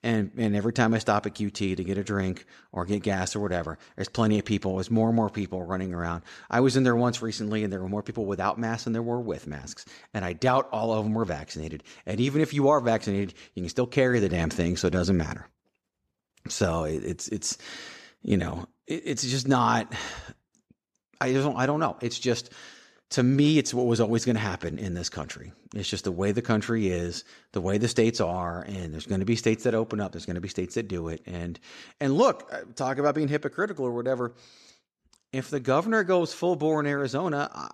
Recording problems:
none

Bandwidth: 14 kHz